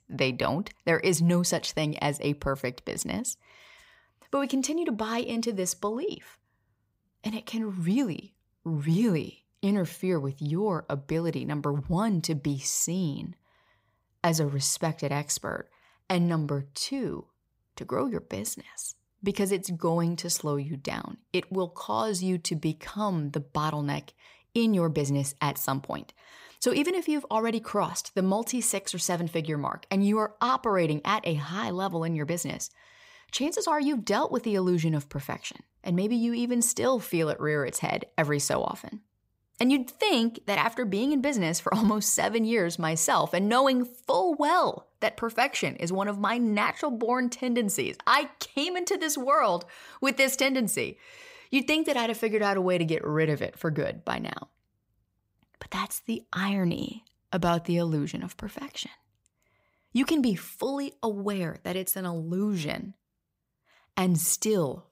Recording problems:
none

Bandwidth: 15.5 kHz